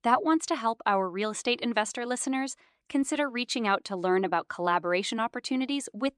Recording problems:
none

